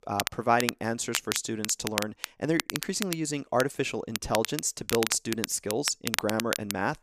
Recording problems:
crackle, like an old record; loud; 4 dB below the speech

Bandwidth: 14.5 kHz